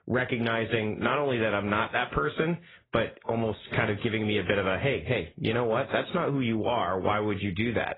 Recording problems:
garbled, watery; badly; nothing above 3.5 kHz
squashed, flat; somewhat

